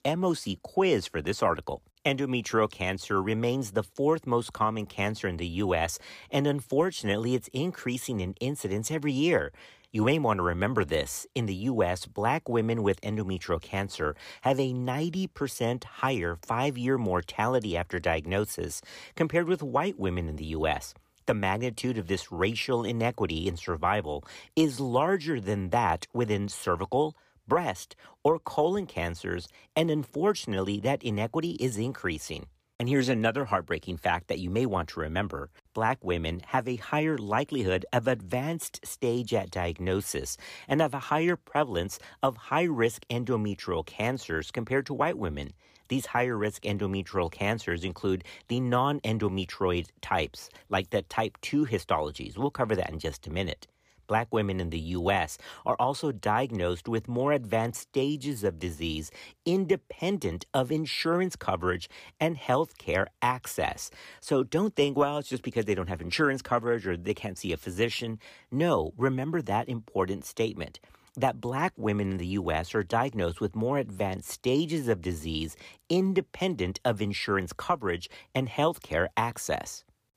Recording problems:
none

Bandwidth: 15 kHz